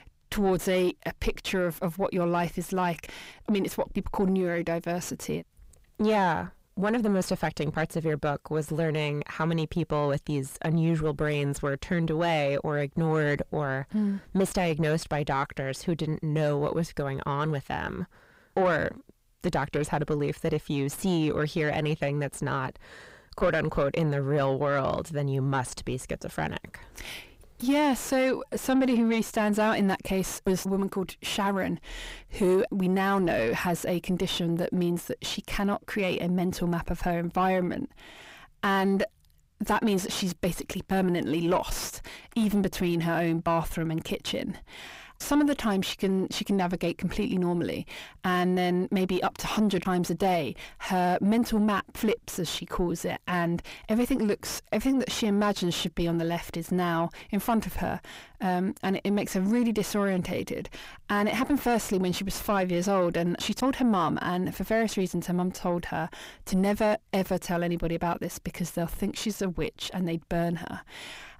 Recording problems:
distortion; slight; 9 dB below the speech

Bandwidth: 15.5 kHz